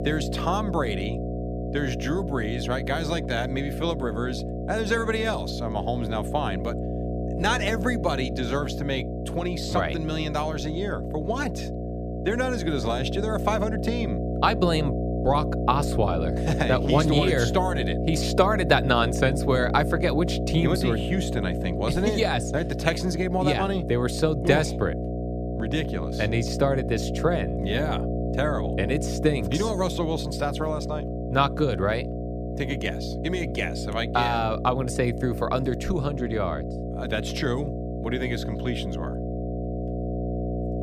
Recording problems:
electrical hum; loud; throughout; 60 Hz, 7 dB below the speech

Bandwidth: 15 kHz